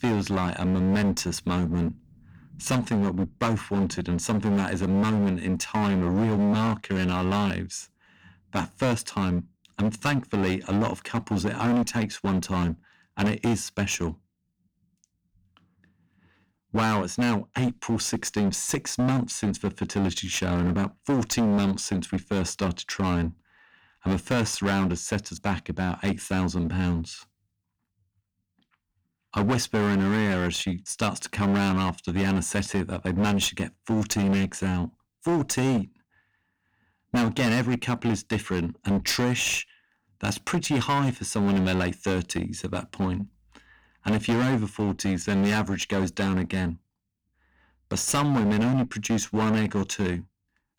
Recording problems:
distortion; heavy; 18% of the sound clipped

